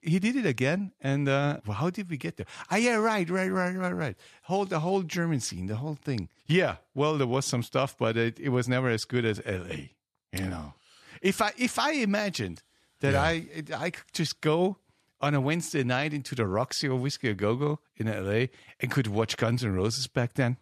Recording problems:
none

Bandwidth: 13.5 kHz